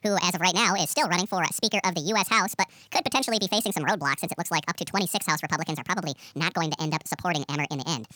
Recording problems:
wrong speed and pitch; too fast and too high; 1.7 times normal speed

